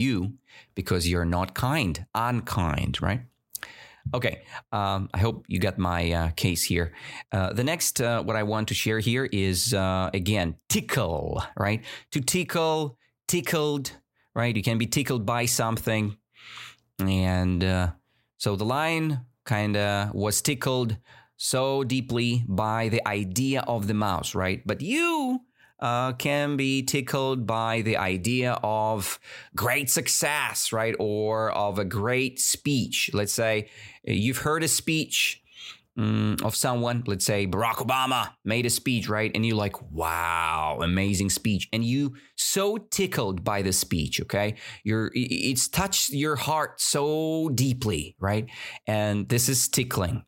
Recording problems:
abrupt cut into speech; at the start

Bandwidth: 16 kHz